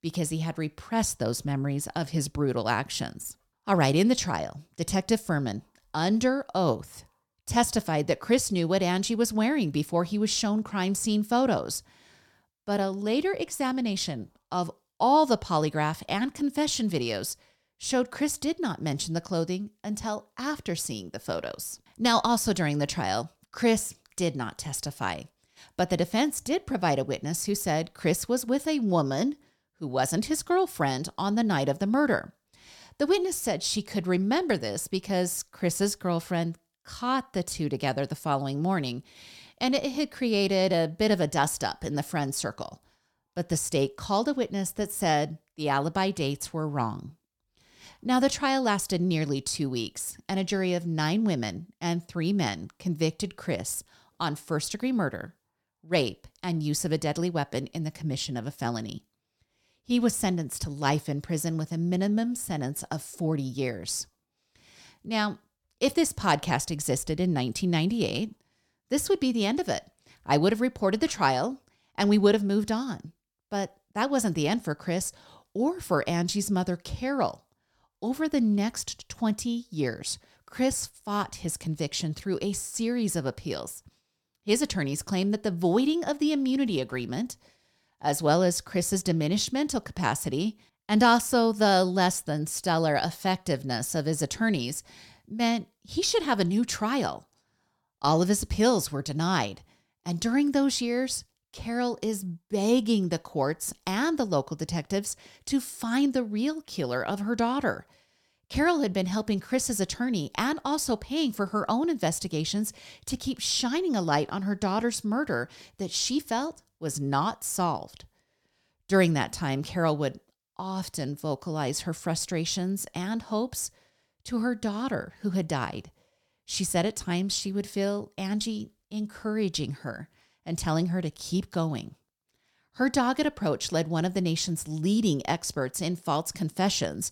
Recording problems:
none

